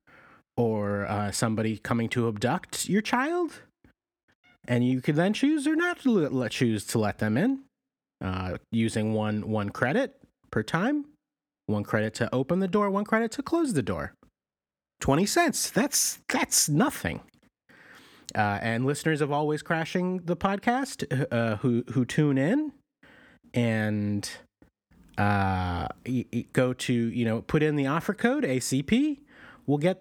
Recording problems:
none

